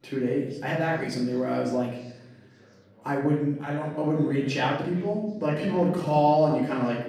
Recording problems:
off-mic speech; far
room echo; noticeable; dies away in 0.8 s
chatter from many people; faint; throughout; 25 dB below the speech
uneven, jittery; strongly; from 0.5 to 6.5 s

